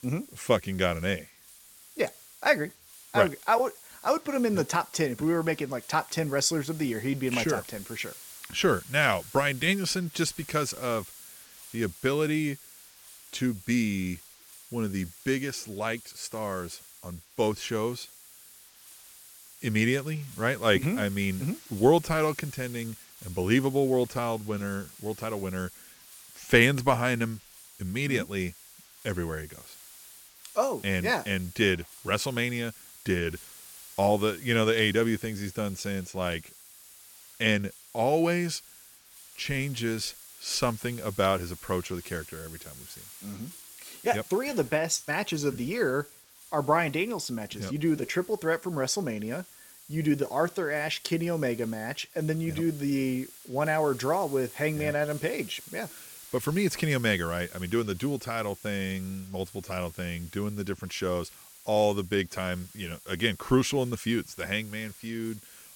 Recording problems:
hiss; noticeable; throughout; 20 dB below the speech

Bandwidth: 17 kHz